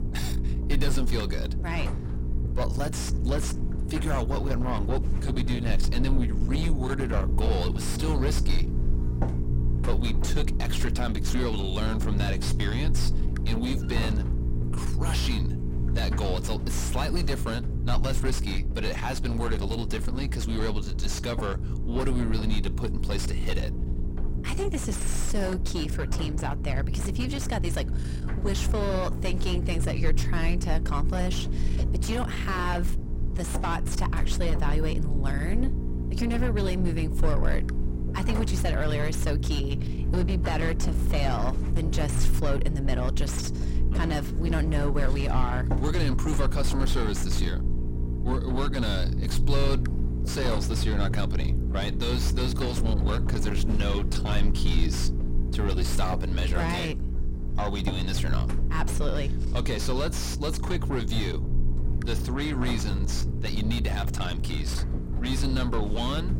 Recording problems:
distortion; heavy; 7 dB below the speech
electrical hum; loud; throughout; 60 Hz, 9 dB below the speech
low rumble; noticeable; throughout; 15 dB below the speech

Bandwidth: 16 kHz